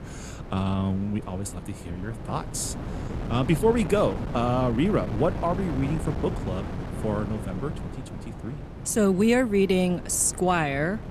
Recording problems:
wind noise on the microphone; occasional gusts; 10 dB below the speech

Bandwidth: 14 kHz